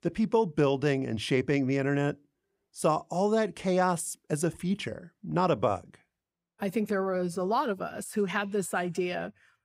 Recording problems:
none

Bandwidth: 15.5 kHz